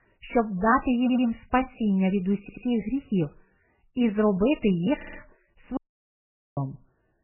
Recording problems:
garbled, watery; badly; nothing above 3 kHz
audio stuttering; at 1 s, at 2.5 s and at 5 s
audio cutting out; at 6 s for 1 s

